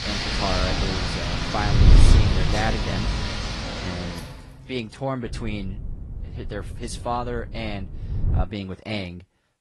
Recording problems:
garbled, watery; slightly
rain or running water; very loud; until 4 s; 4 dB above the speech
wind noise on the microphone; heavy; until 3.5 s and from 5.5 to 8.5 s; 9 dB below the speech

